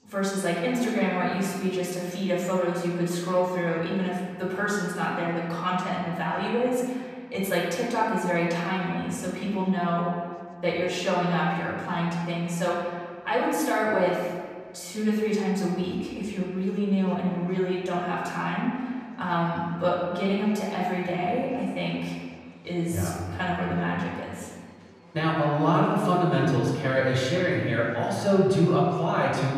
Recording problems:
off-mic speech; far
room echo; noticeable; dies away in 1.7 s
chatter from many people; faint; throughout; 30 dB below the speech

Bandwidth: 14.5 kHz